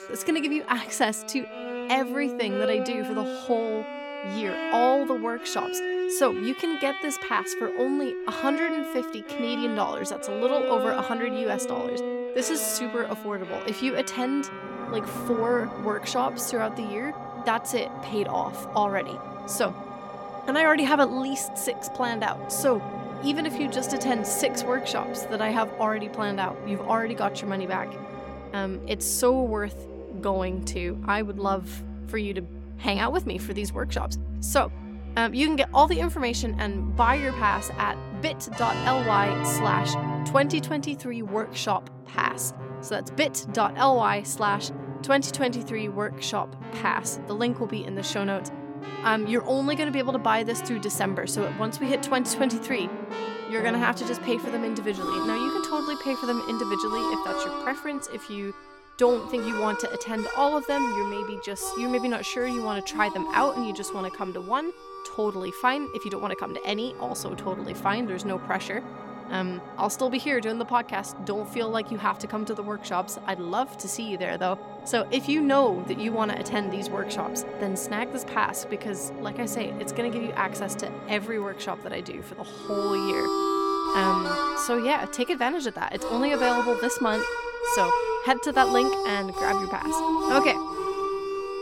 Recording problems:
background music; loud; throughout; 5 dB below the speech

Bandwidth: 17 kHz